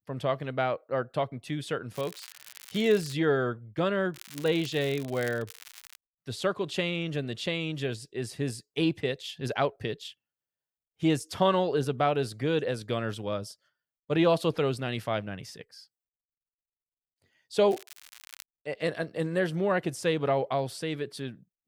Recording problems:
crackling; noticeable; from 2 to 3 s, from 4 to 6 s and at 18 s; 20 dB below the speech

